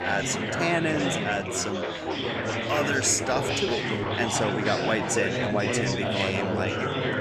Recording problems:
chatter from many people; very loud; throughout; as loud as the speech

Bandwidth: 14.5 kHz